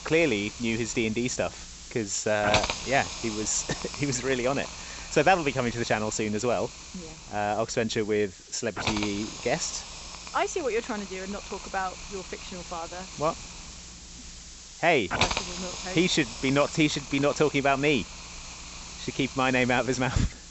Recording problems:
high frequencies cut off; noticeable; nothing above 7.5 kHz
hiss; loud; throughout; 9 dB below the speech

